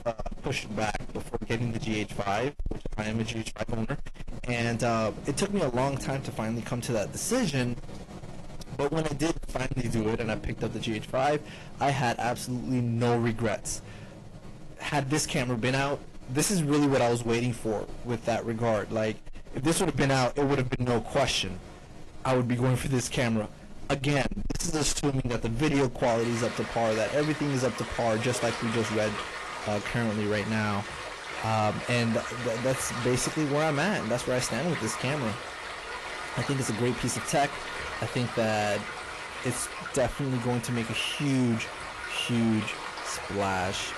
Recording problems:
distortion; heavy; 6 dB below the speech
garbled, watery; slightly; nothing above 11.5 kHz
rain or running water; loud; throughout; 9 dB below the speech

